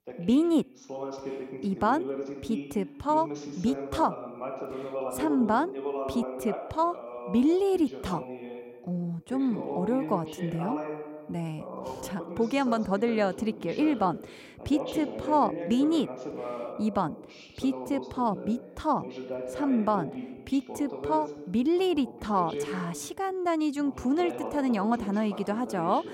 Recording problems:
voice in the background; loud; throughout; 9 dB below the speech

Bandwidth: 16 kHz